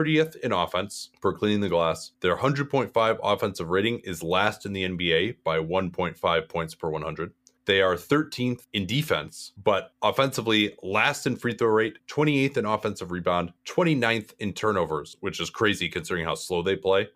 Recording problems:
abrupt cut into speech; at the start

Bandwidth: 15 kHz